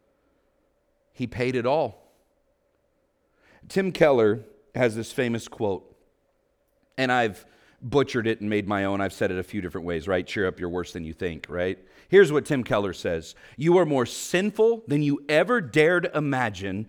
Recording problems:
none

